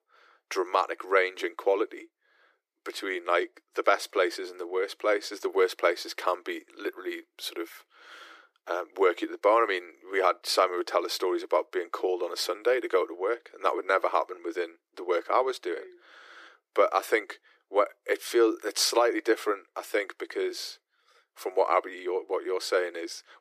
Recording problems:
thin; very; fading below 350 Hz

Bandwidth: 14.5 kHz